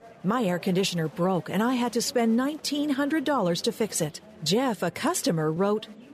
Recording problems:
murmuring crowd; faint; throughout; 20 dB below the speech

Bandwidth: 14.5 kHz